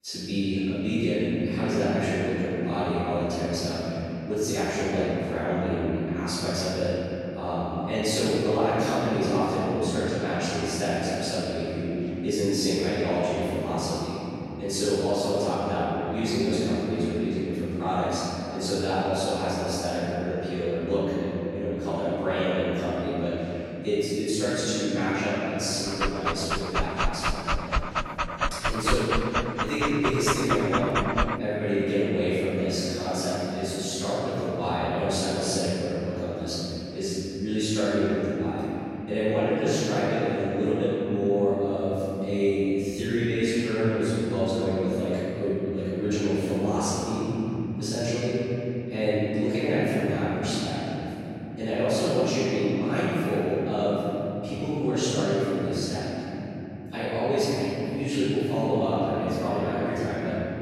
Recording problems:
room echo; strong; dies away in 3 s
off-mic speech; far
dog barking; loud; from 26 to 31 s; peak level with the speech

